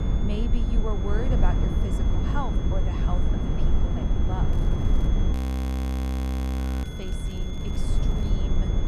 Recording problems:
echo of what is said; faint; from 6.5 s on; 590 ms later, 20 dB below the speech
wind noise on the microphone; heavy; 1 dB above the speech
high-pitched whine; loud; throughout; 3.5 kHz, 10 dB below the speech
crackling; faint; at 4.5 s and from 7 to 8.5 s; 20 dB below the speech
audio freezing; at 5.5 s for 1.5 s

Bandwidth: 14.5 kHz